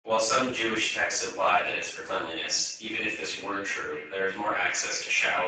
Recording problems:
off-mic speech; far
garbled, watery; badly; nothing above 7.5 kHz
echo of what is said; noticeable; from 3 s on; 250 ms later, 15 dB below the speech
room echo; noticeable; dies away in 0.6 s
thin; somewhat; fading below 700 Hz
abrupt cut into speech; at the end

